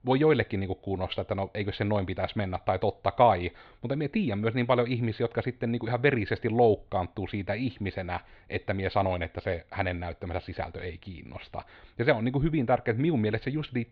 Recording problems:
muffled; slightly; fading above 4 kHz

